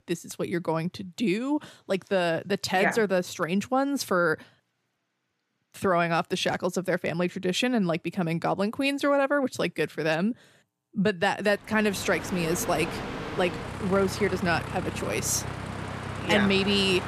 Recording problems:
train or aircraft noise; loud; from 12 s on; 8 dB below the speech

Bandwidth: 15 kHz